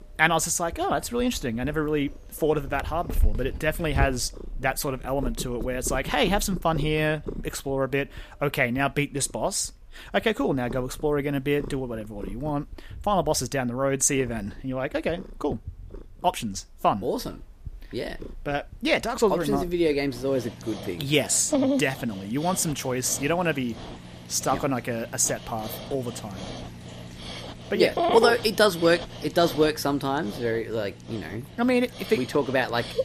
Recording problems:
animal sounds; loud; throughout; 10 dB below the speech

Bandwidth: 14.5 kHz